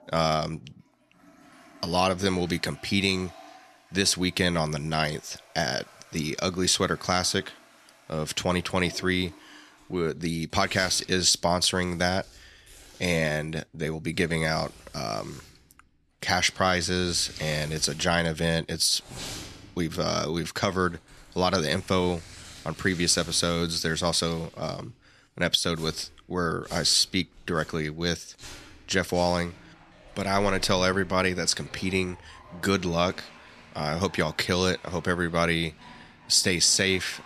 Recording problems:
household noises; faint; throughout; 20 dB below the speech

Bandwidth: 13.5 kHz